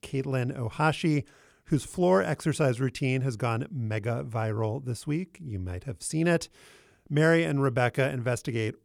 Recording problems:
none

